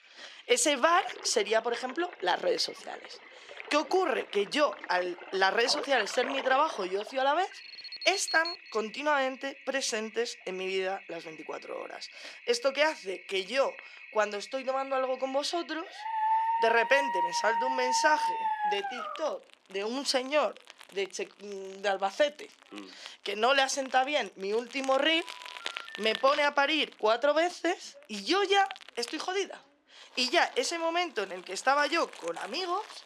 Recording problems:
thin; somewhat; fading below 450 Hz
household noises; noticeable; throughout; 15 dB below the speech
alarm; noticeable; from 7.5 to 8.5 s; peak 5 dB below the speech
dog barking; loud; from 16 to 19 s; peak 2 dB above the speech
phone ringing; faint; from 25 to 26 s; peak 15 dB below the speech

